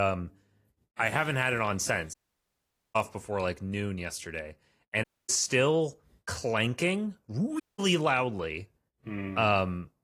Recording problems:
garbled, watery; slightly
abrupt cut into speech; at the start
audio cutting out; at 2 s for 1 s, at 5 s and at 7.5 s

